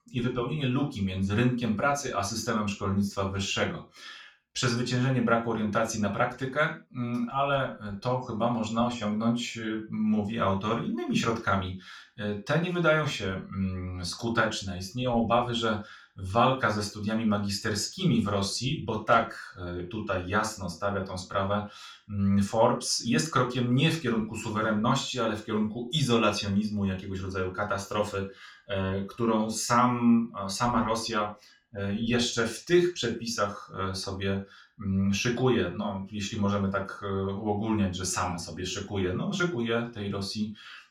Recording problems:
off-mic speech; far
room echo; slight; dies away in 0.3 s

